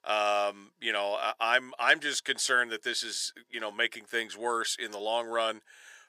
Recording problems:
thin; very; fading below 550 Hz

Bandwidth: 15 kHz